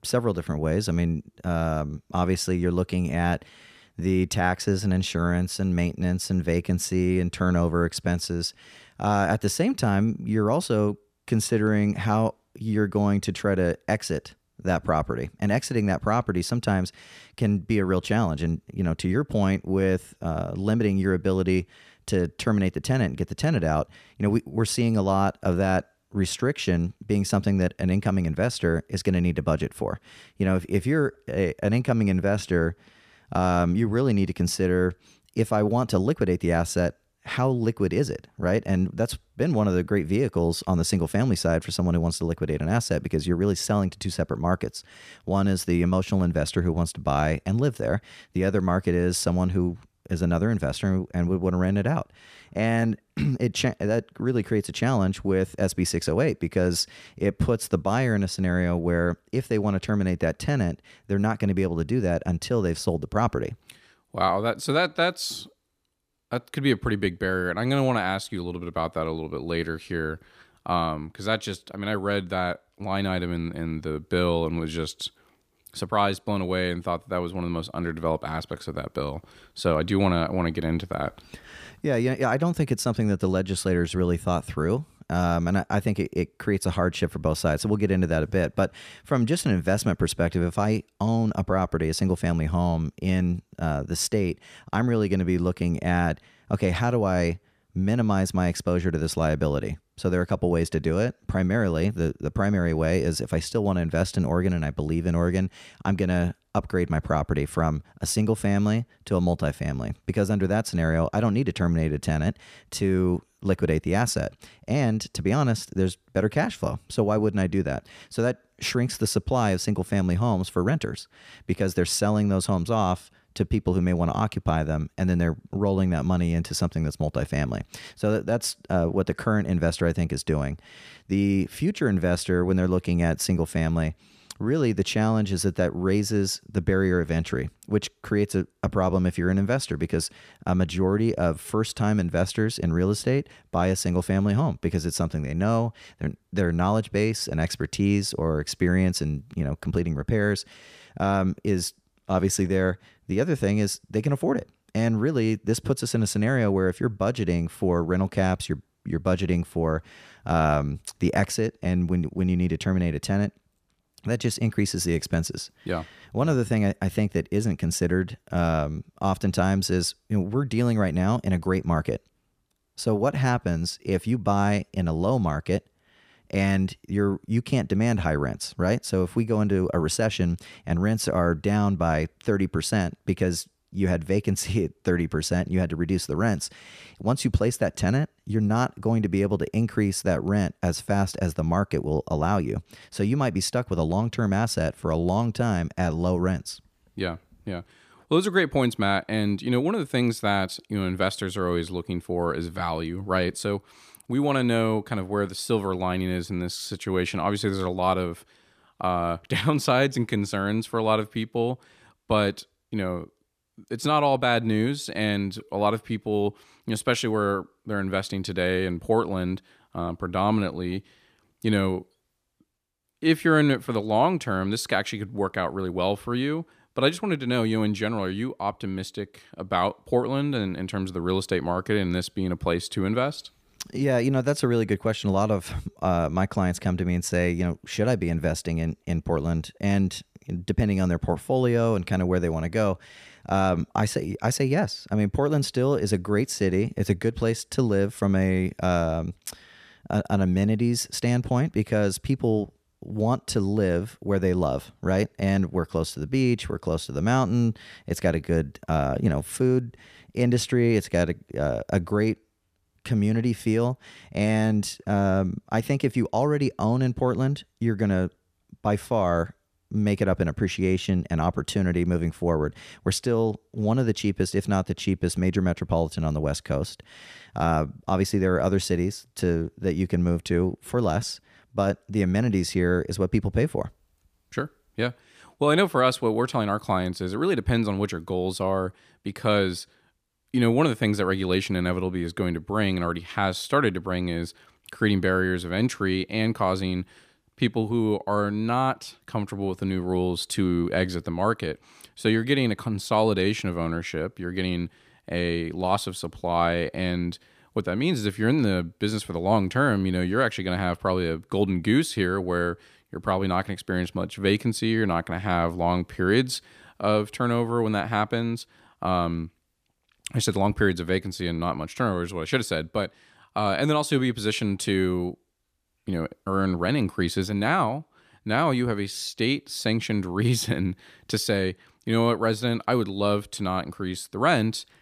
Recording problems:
none

